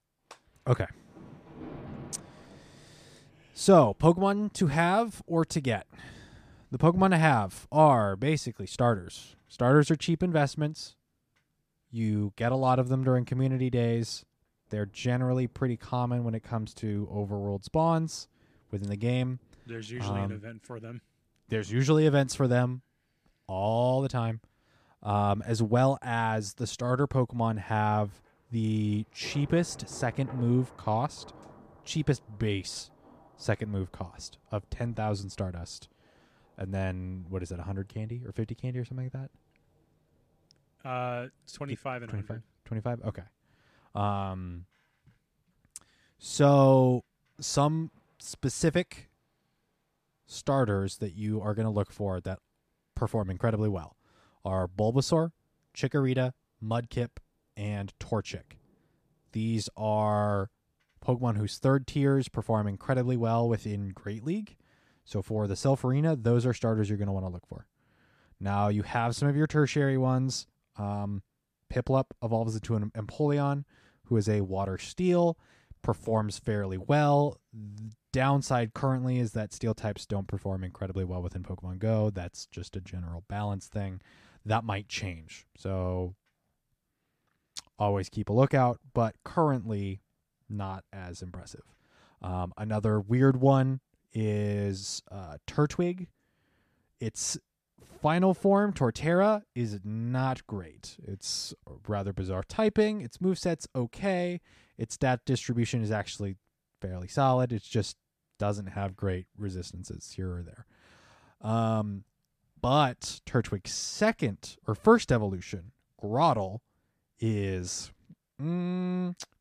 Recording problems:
rain or running water; faint; throughout; 25 dB below the speech

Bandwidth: 14.5 kHz